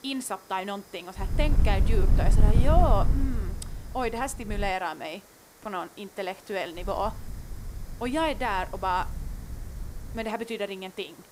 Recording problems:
wind noise on the microphone; occasional gusts; from 1 to 4.5 s and from 7 to 10 s; 10 dB below the speech
hiss; noticeable; throughout; 20 dB below the speech
high-pitched whine; faint; until 4.5 s and from 6.5 to 9 s; 5 kHz, 35 dB below the speech

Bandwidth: 15.5 kHz